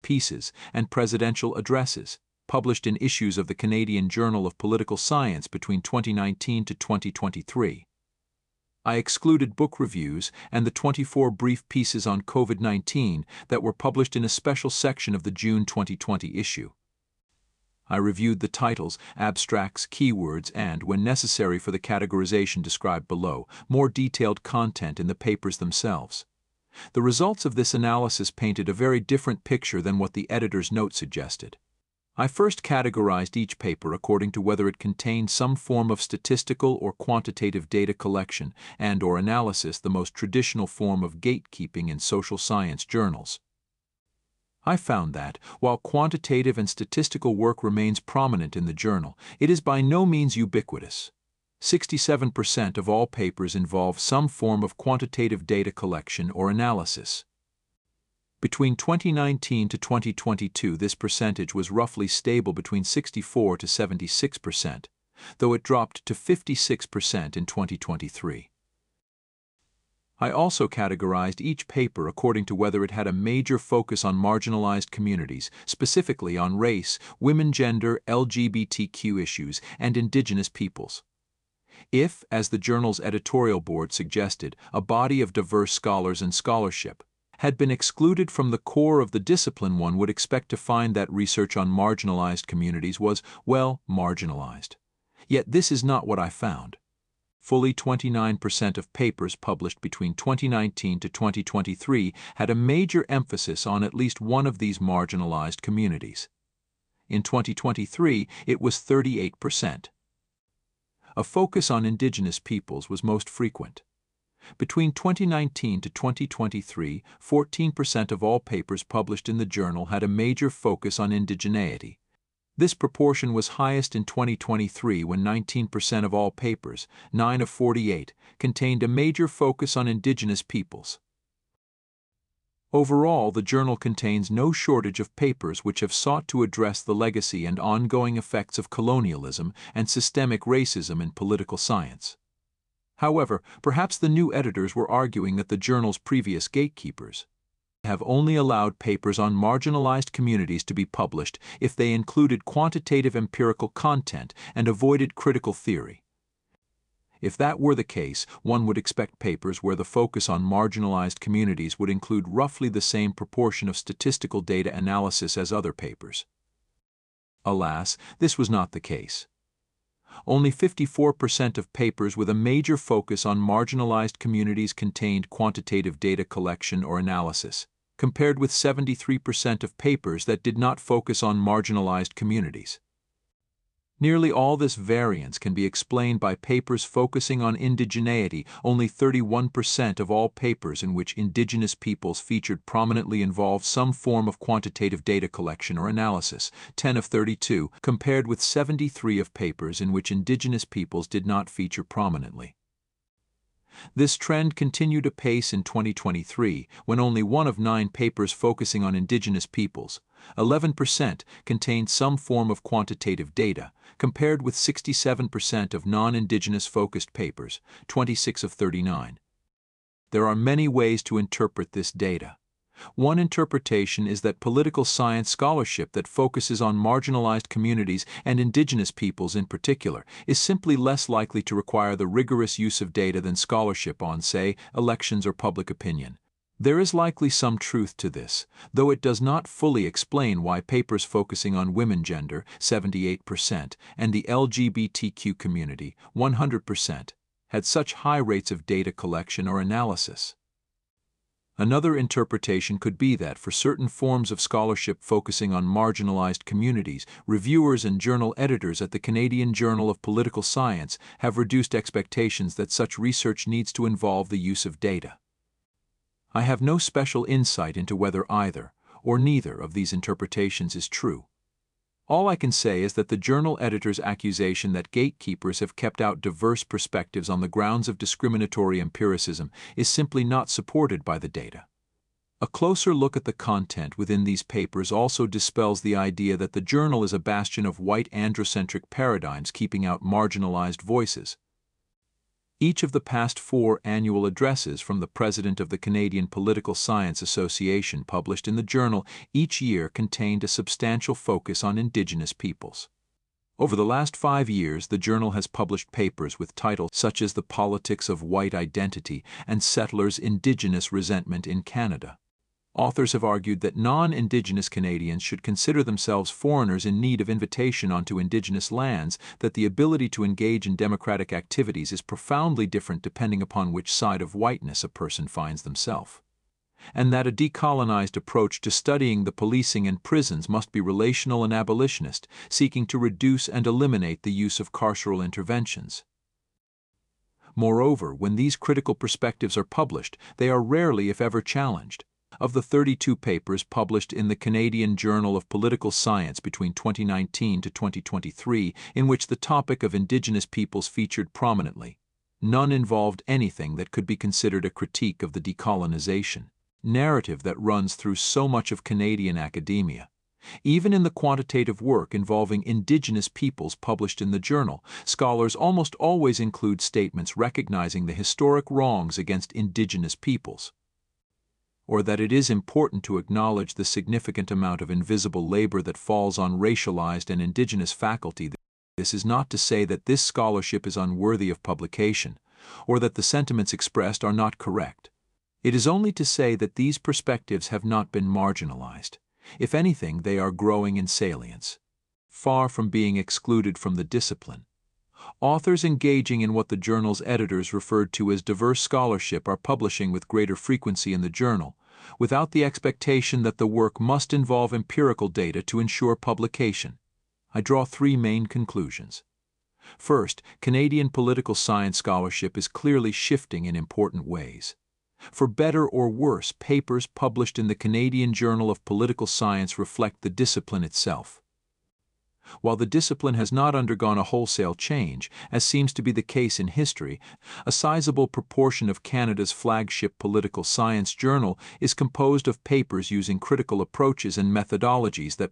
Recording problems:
none

